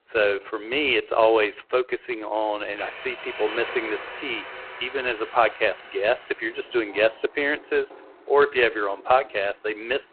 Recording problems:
phone-call audio; poor line
traffic noise; noticeable; throughout; 15 dB below the speech

